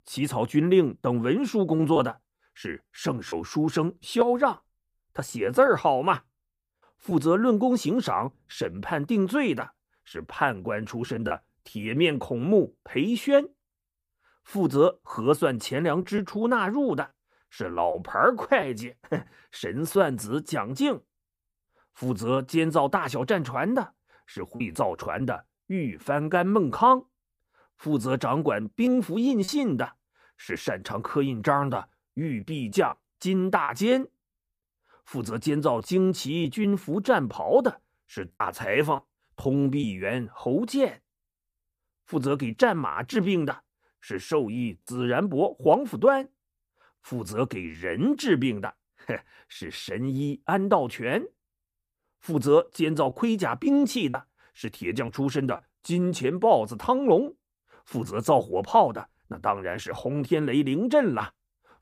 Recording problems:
choppy; occasionally; 2% of the speech affected

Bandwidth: 15 kHz